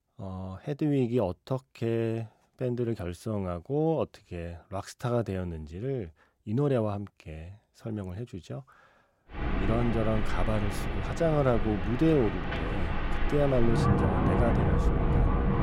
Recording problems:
wind in the background; very loud; from 9.5 s on; as loud as the speech

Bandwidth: 16 kHz